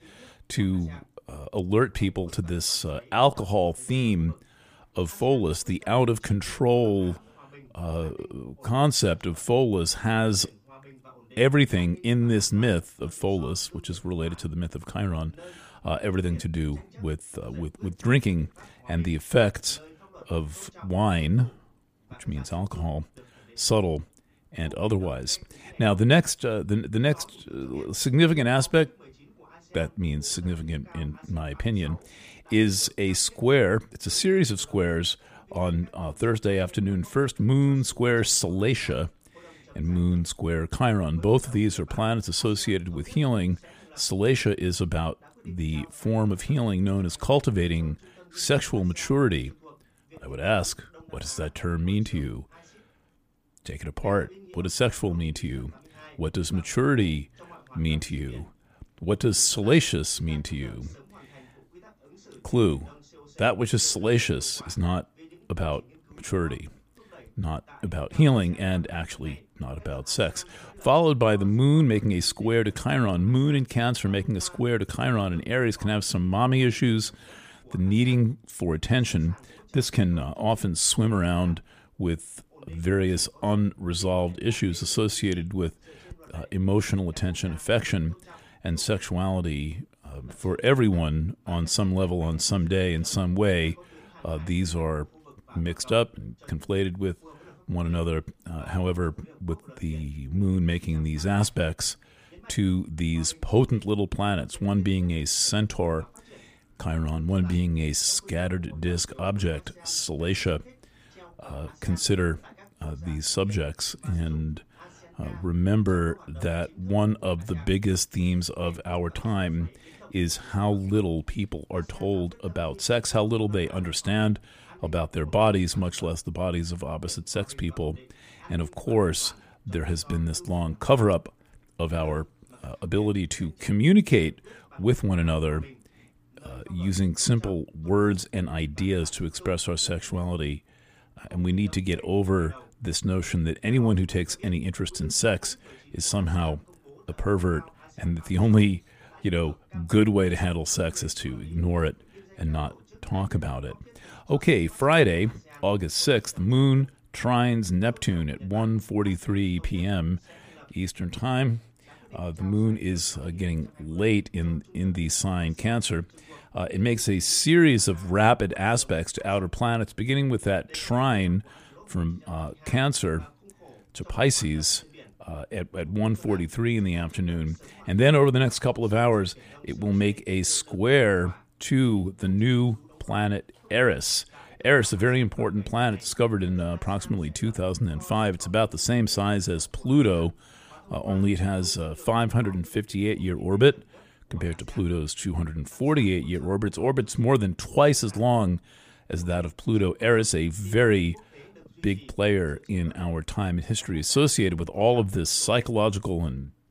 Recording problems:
voice in the background; faint; throughout; 25 dB below the speech

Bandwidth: 15 kHz